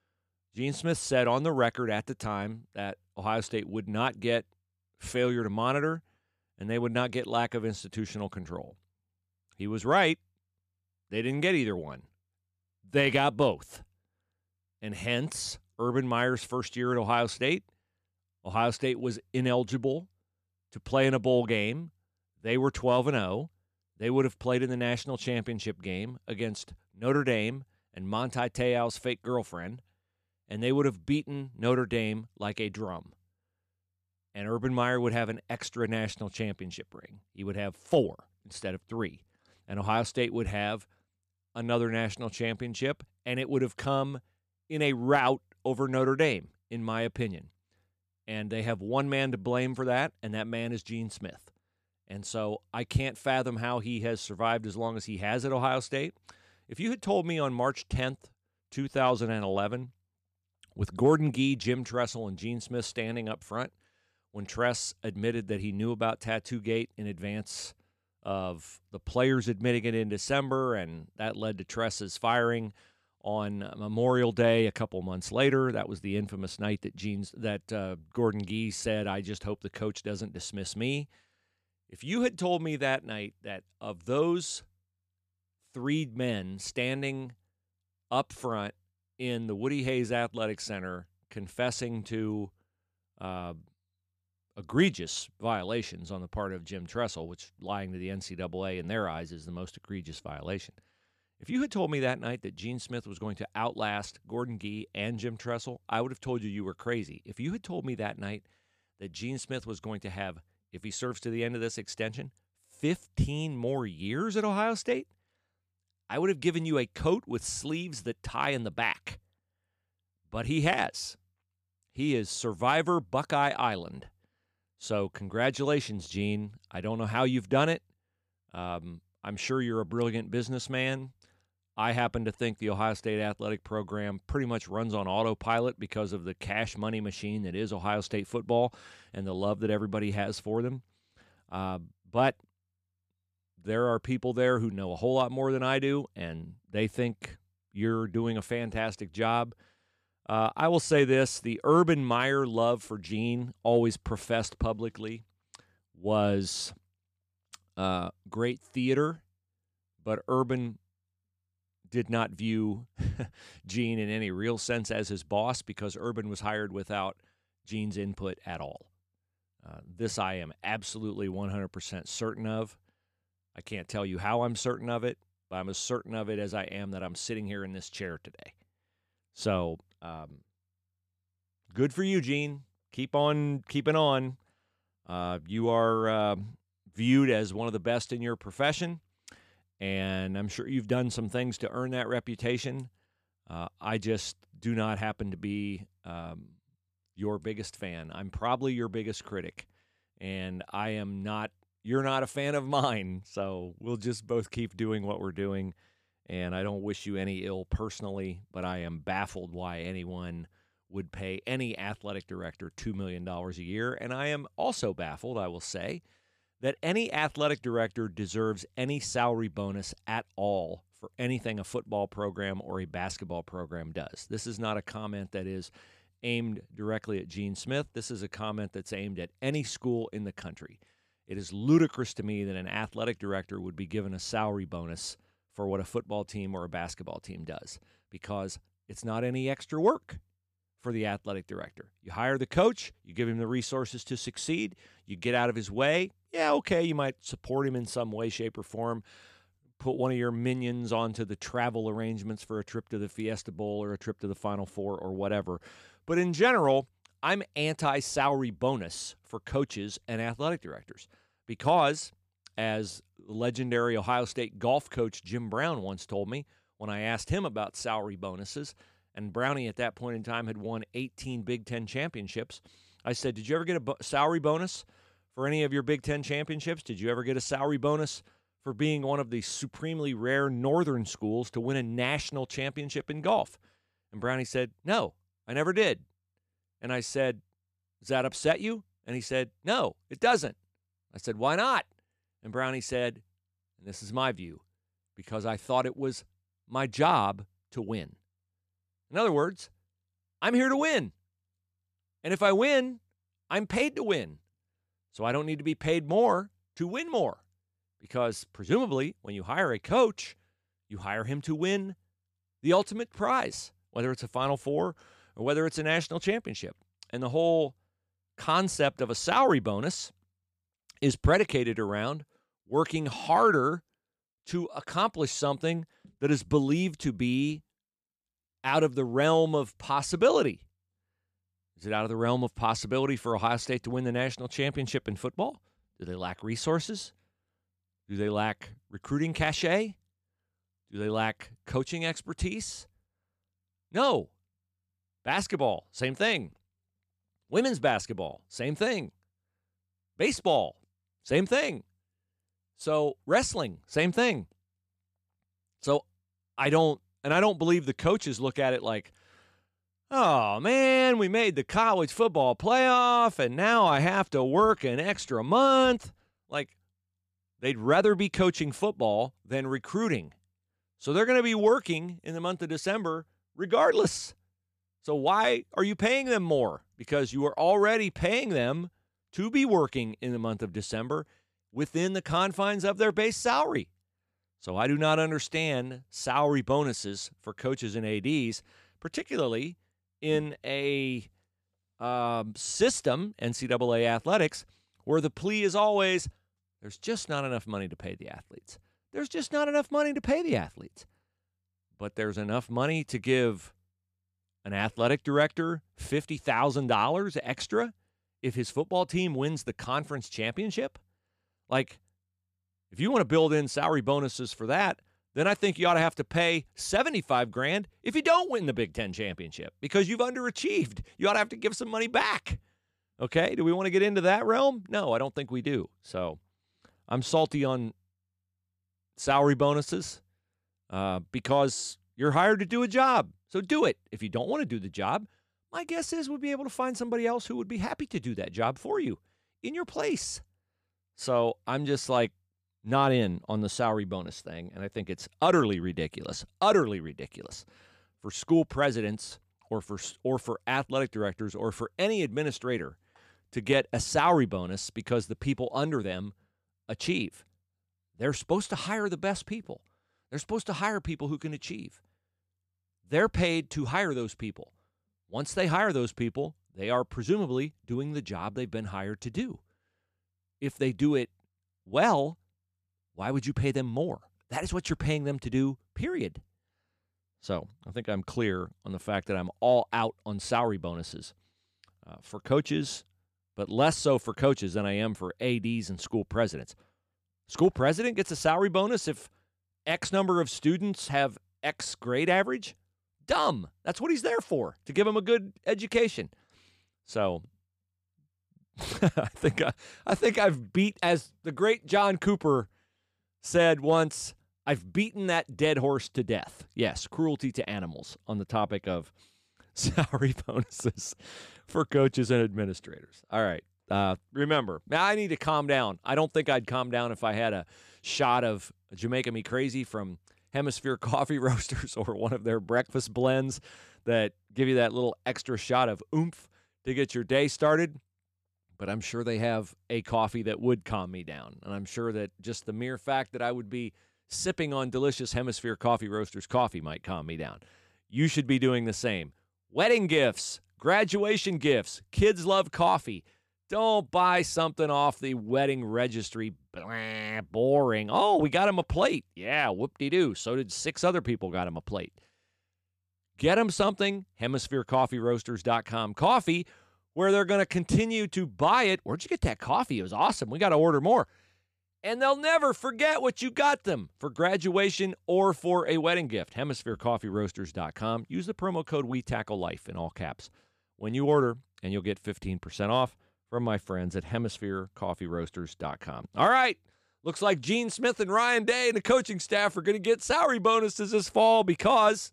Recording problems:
none

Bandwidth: 15 kHz